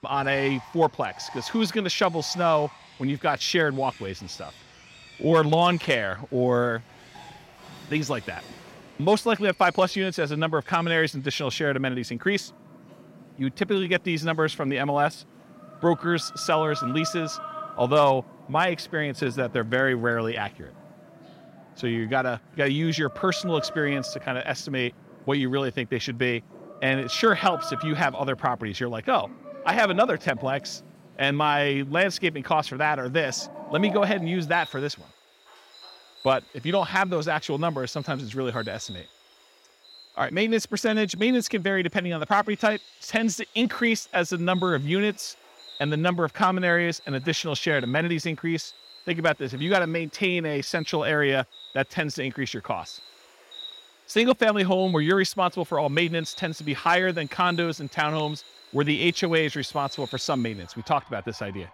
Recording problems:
animal sounds; noticeable; throughout; 20 dB below the speech

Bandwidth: 16 kHz